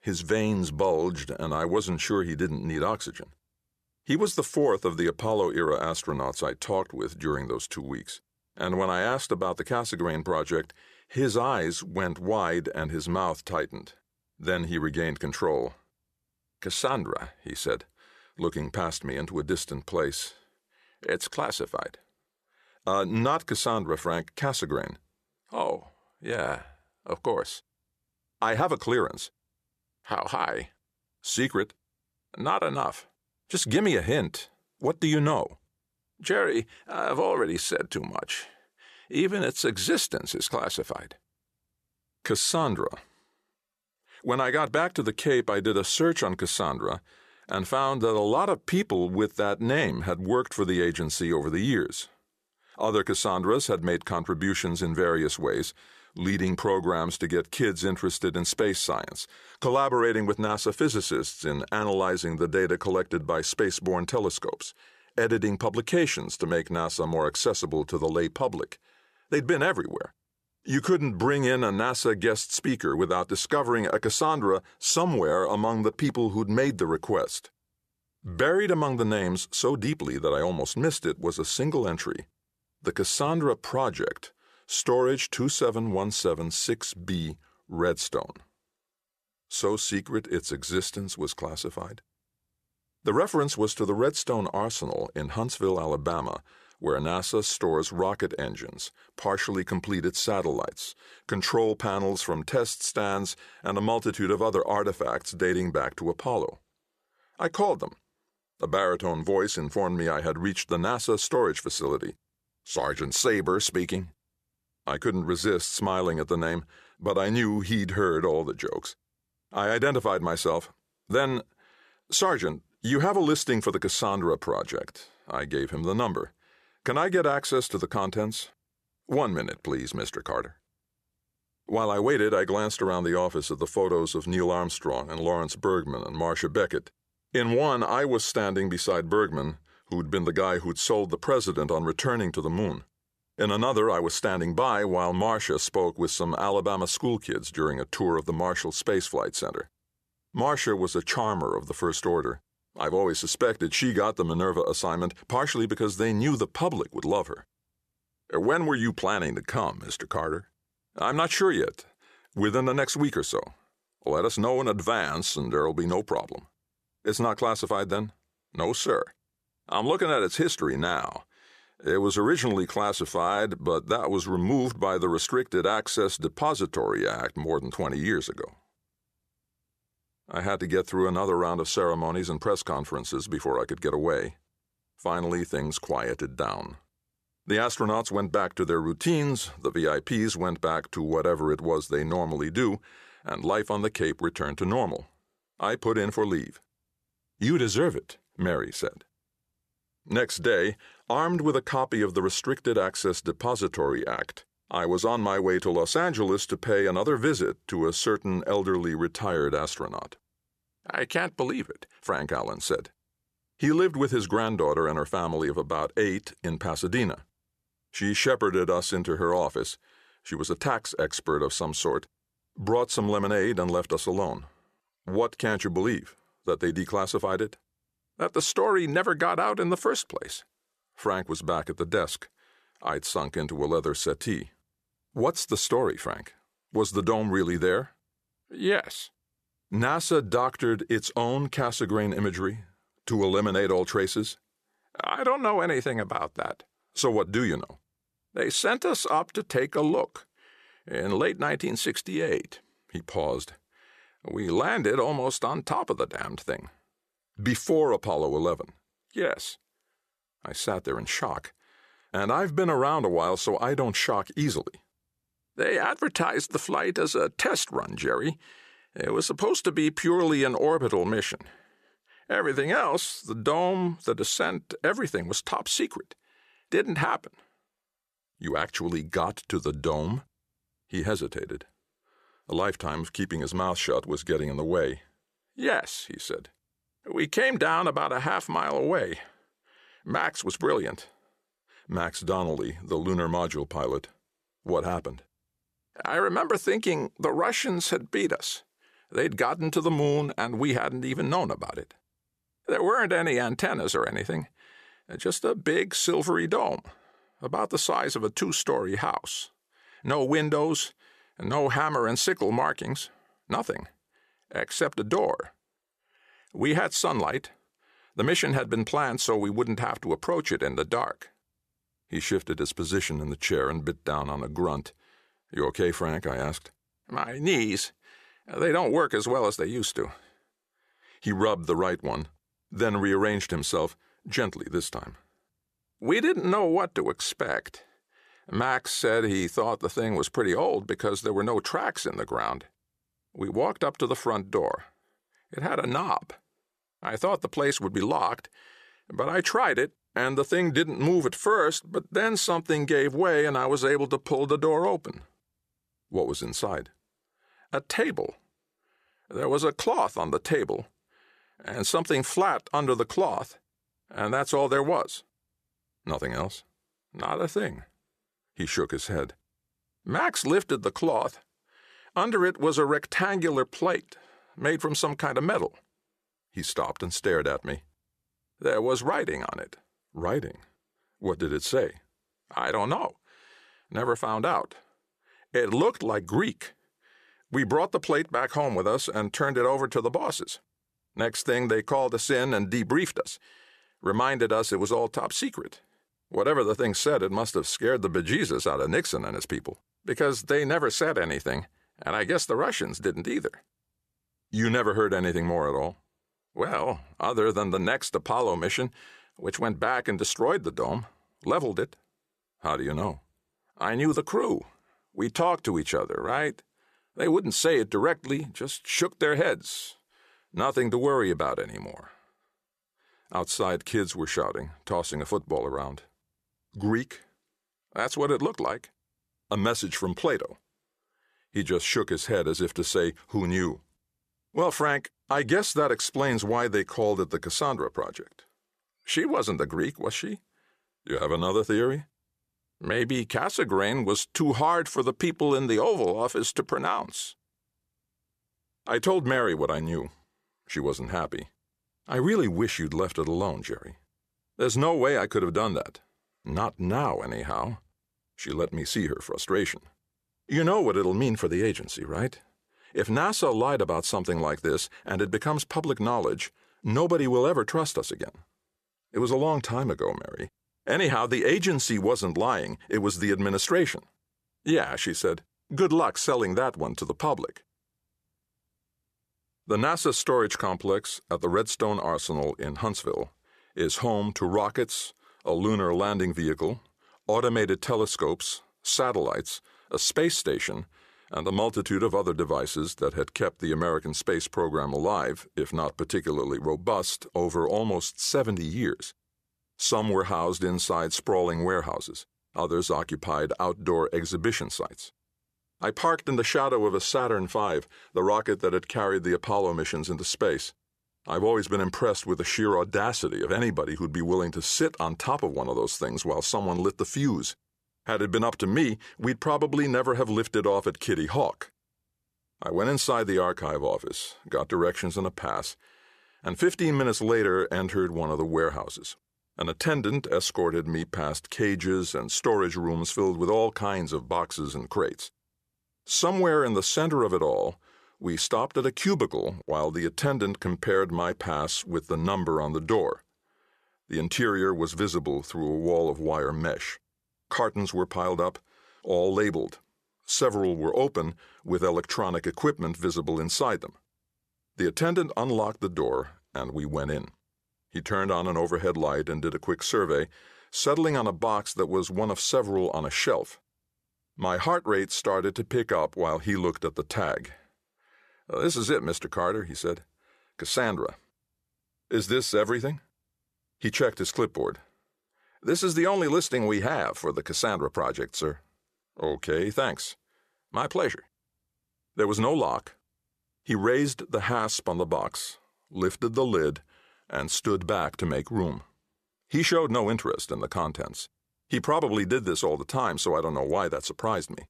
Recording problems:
none

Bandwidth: 14.5 kHz